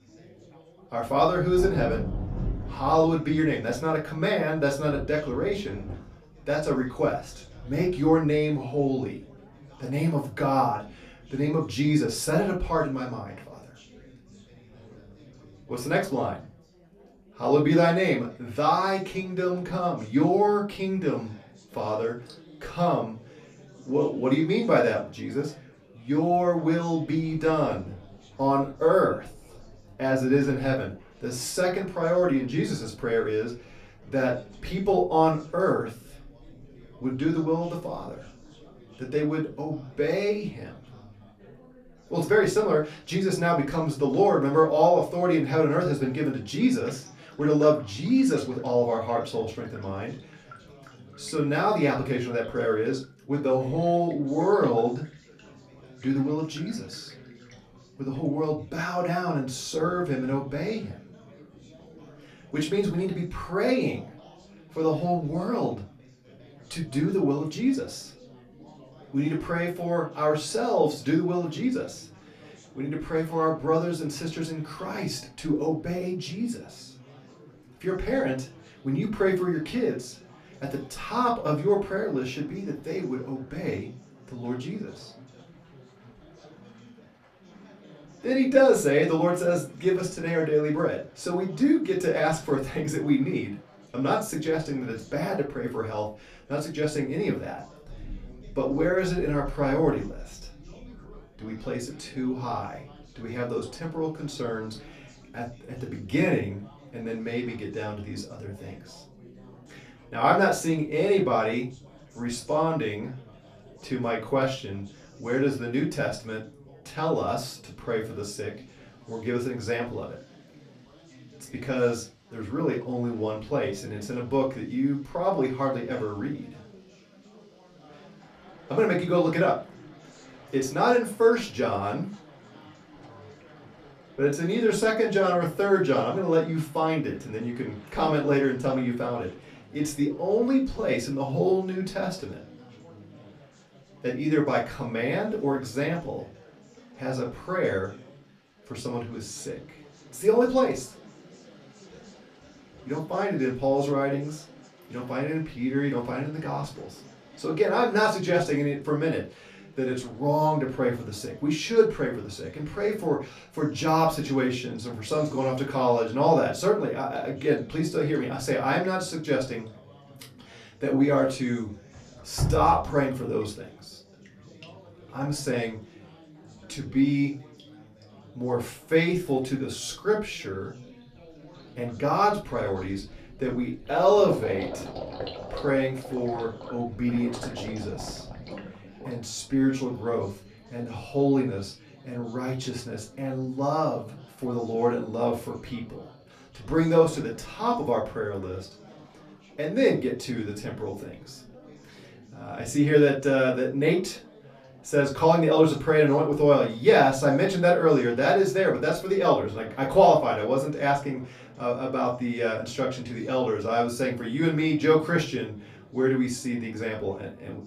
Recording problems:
off-mic speech; far
room echo; very slight; dies away in 0.3 s
rain or running water; noticeable; throughout; 20 dB below the speech
chatter from many people; faint; throughout; 25 dB below the speech

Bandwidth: 14.5 kHz